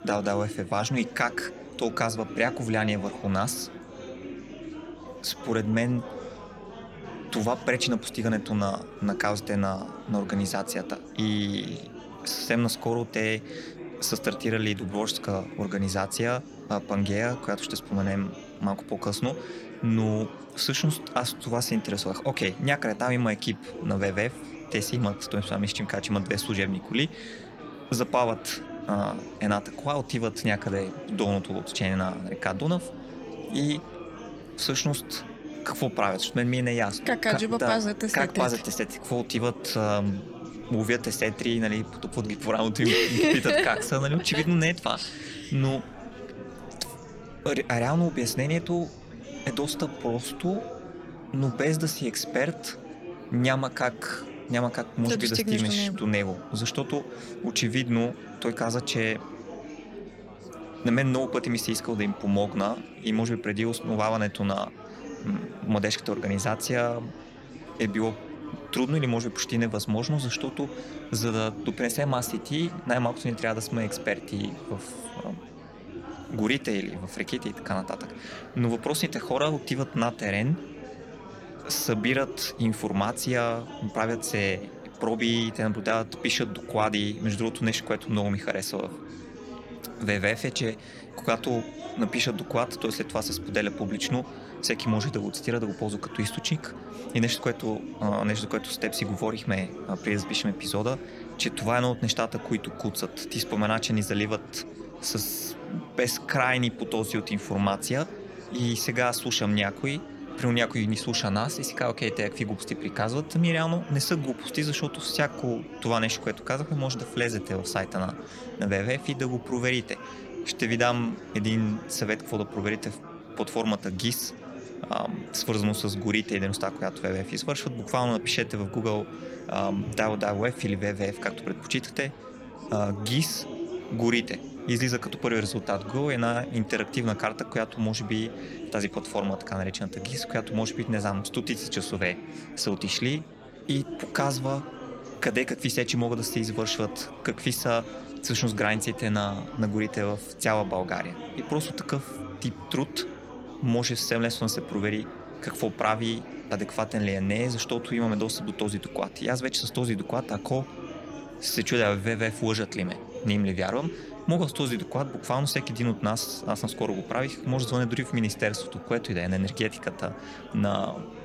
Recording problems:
chatter from many people; noticeable; throughout; 10 dB below the speech

